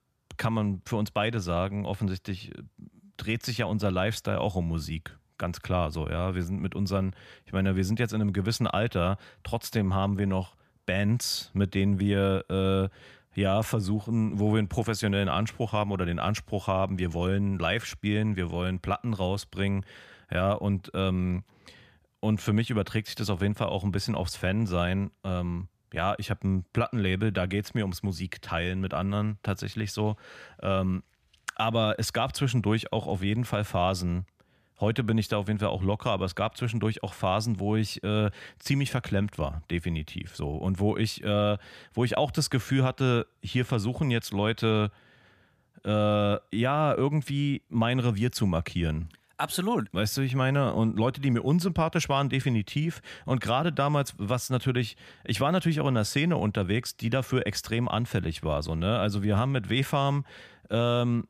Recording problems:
none

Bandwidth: 14.5 kHz